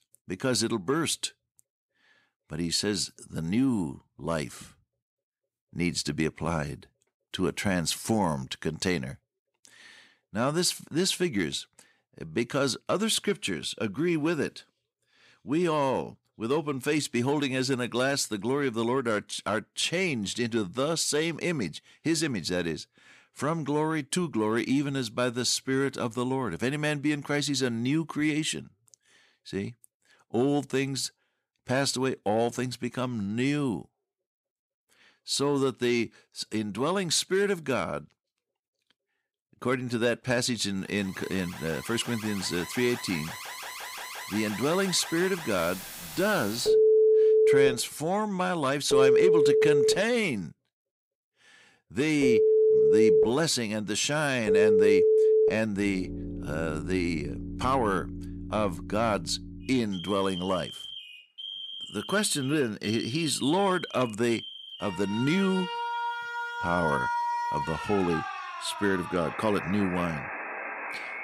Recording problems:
alarms or sirens; very loud; from 41 s on; 1 dB above the speech

